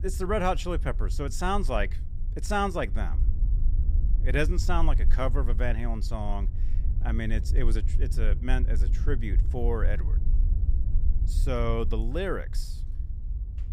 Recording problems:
low rumble; noticeable; throughout; 15 dB below the speech

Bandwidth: 15 kHz